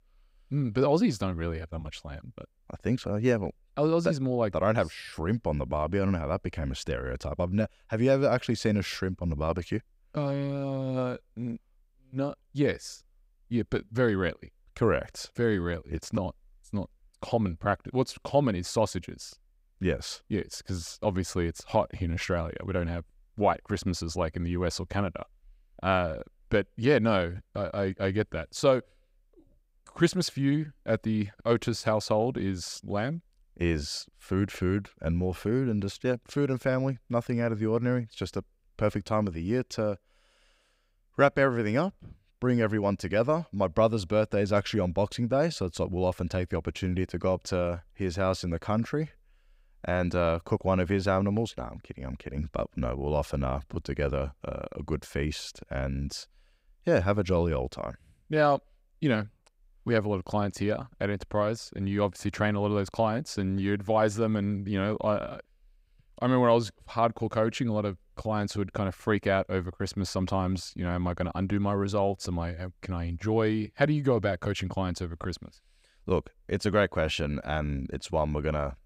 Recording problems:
none

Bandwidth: 15.5 kHz